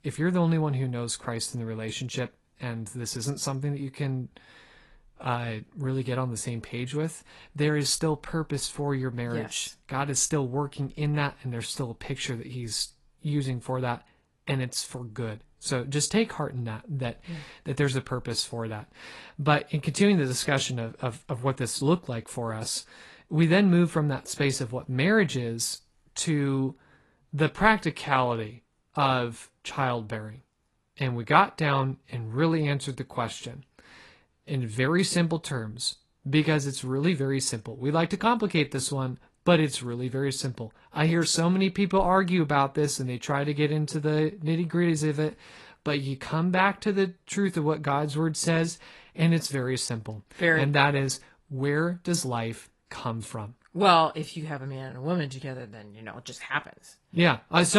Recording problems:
garbled, watery; slightly; nothing above 11.5 kHz
abrupt cut into speech; at the end

